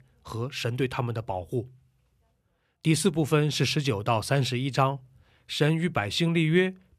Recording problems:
none

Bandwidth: 14.5 kHz